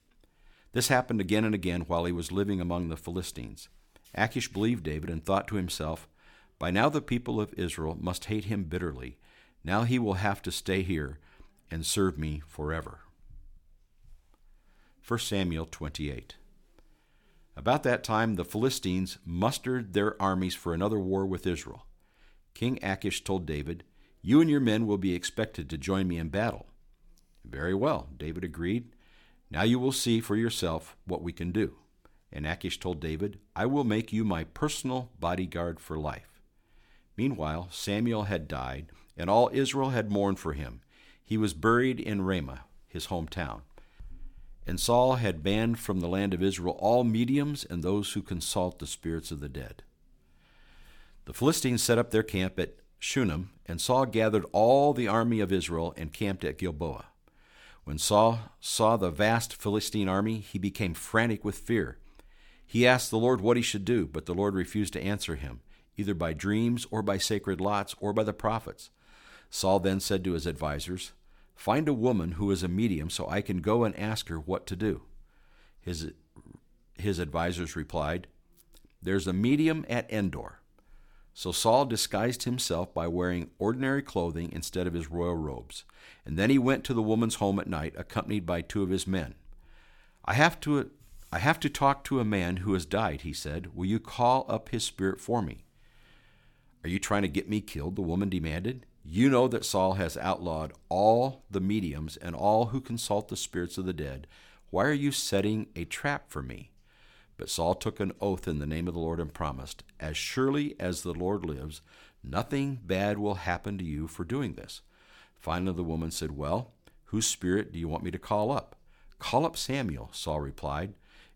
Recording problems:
none

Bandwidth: 17.5 kHz